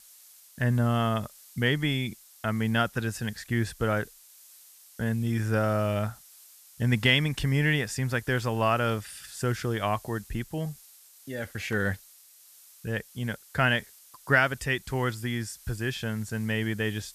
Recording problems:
hiss; faint; throughout; 20 dB below the speech

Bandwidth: 14.5 kHz